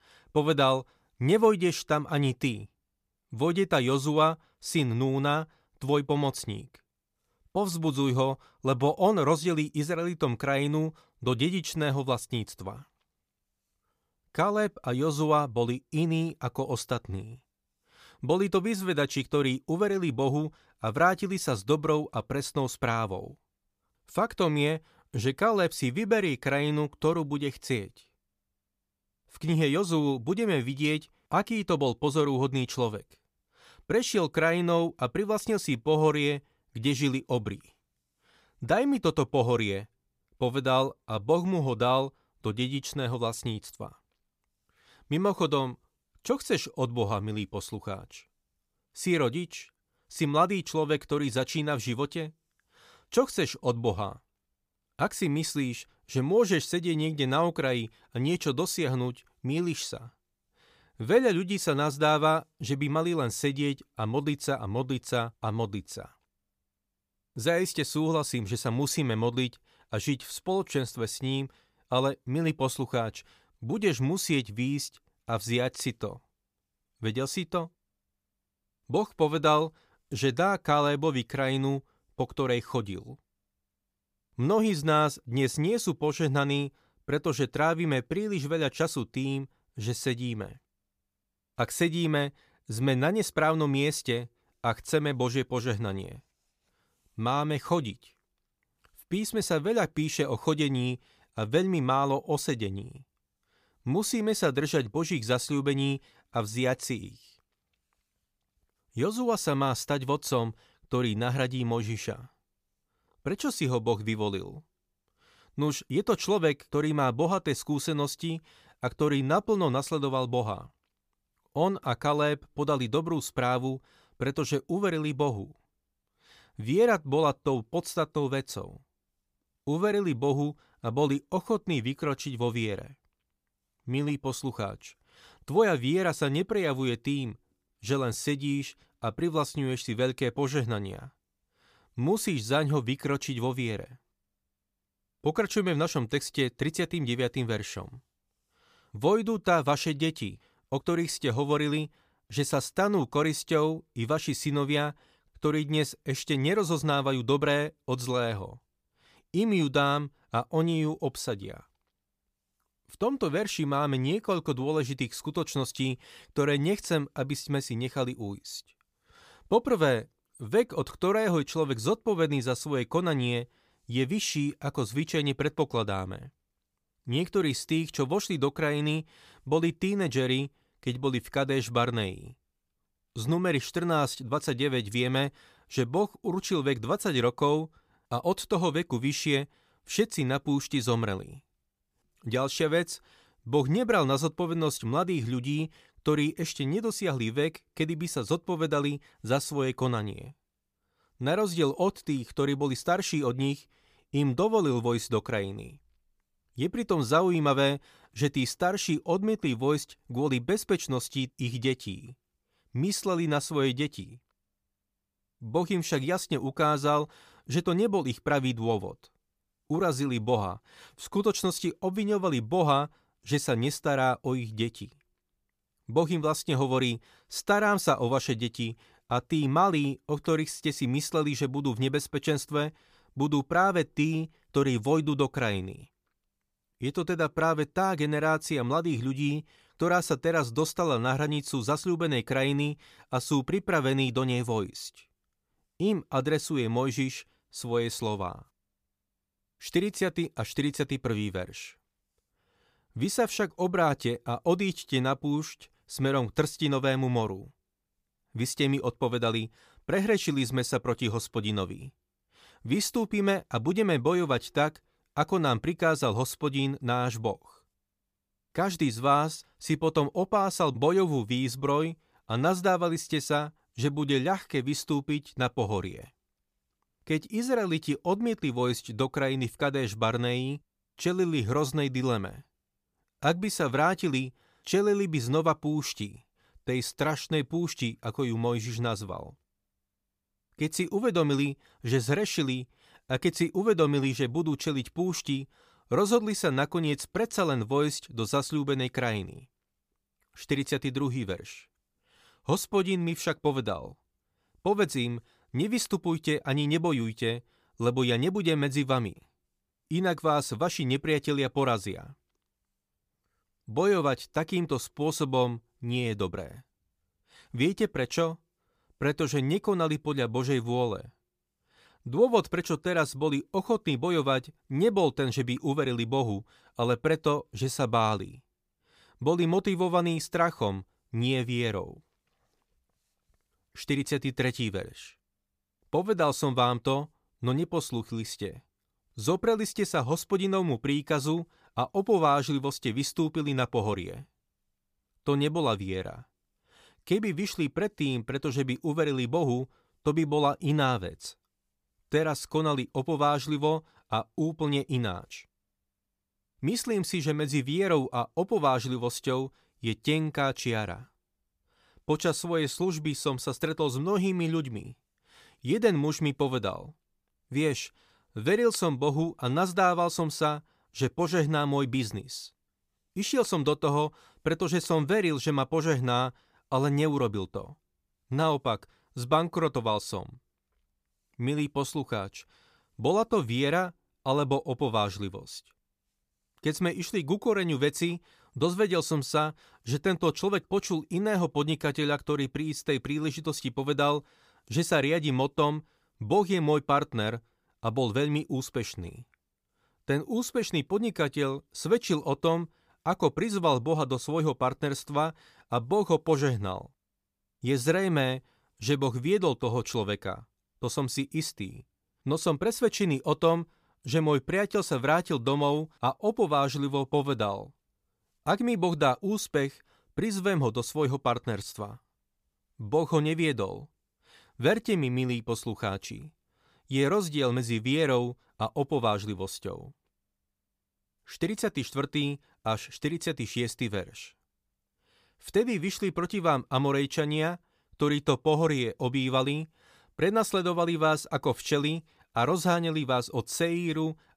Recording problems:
none

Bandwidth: 15 kHz